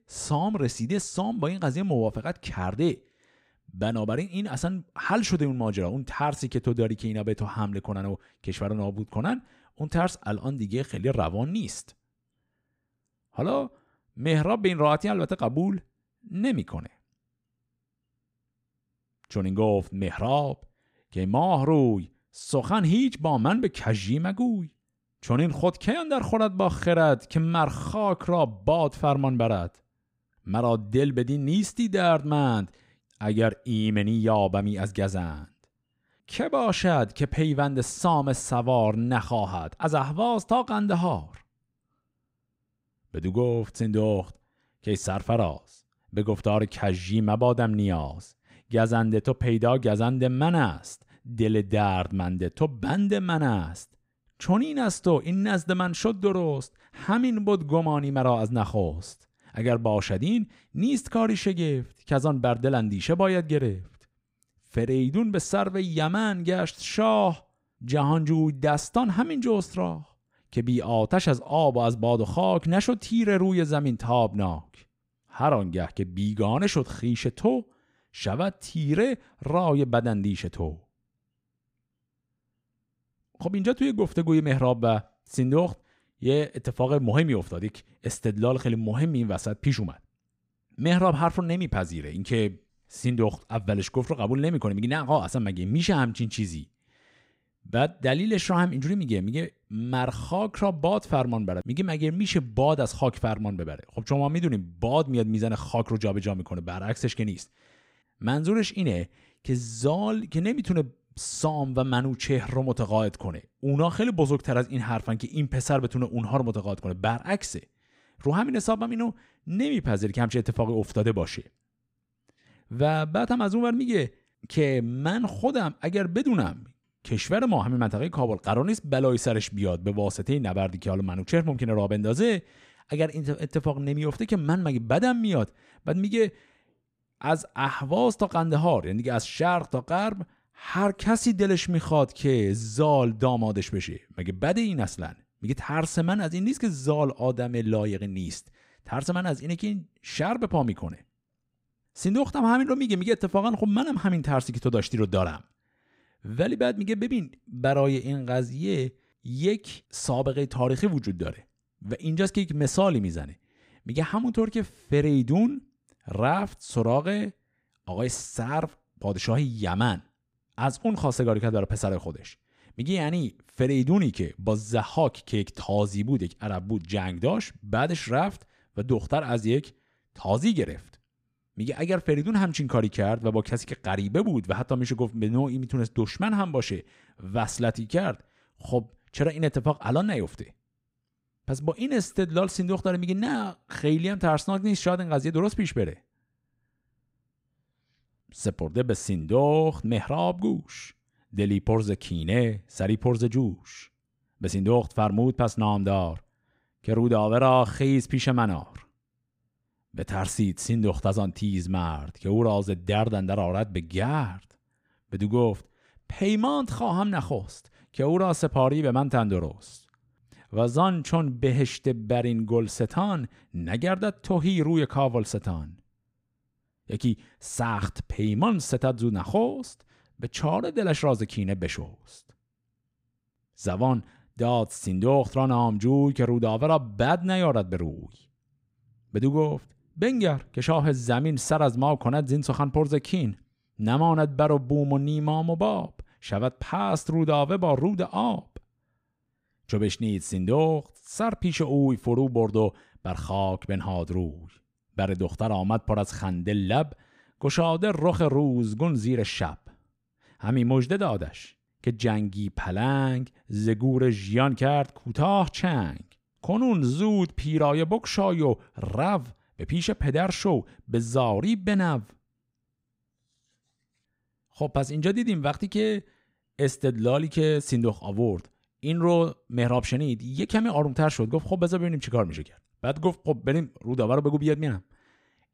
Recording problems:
none

